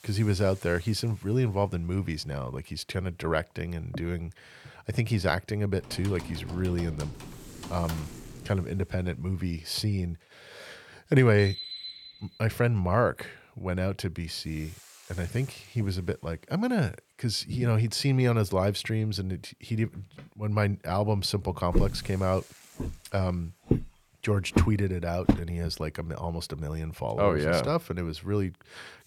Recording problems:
hiss; faint; throughout; 25 dB below the speech
keyboard typing; faint; from 6 to 8.5 s; peak 10 dB below the speech
alarm; noticeable; from 11 to 12 s; peak 7 dB below the speech
footsteps; loud; from 22 to 25 s; peak 2 dB above the speech

